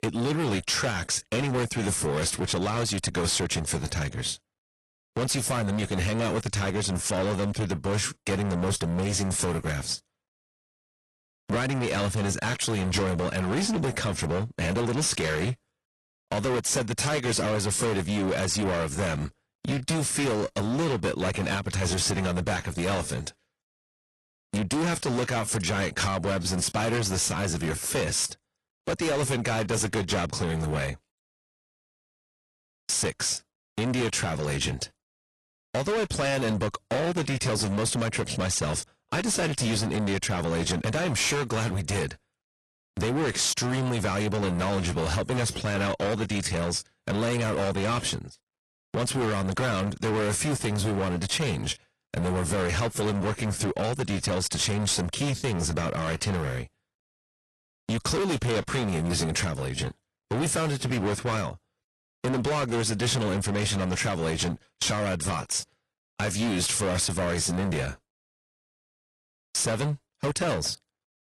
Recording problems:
distortion; heavy; 25% of the sound clipped
garbled, watery; slightly

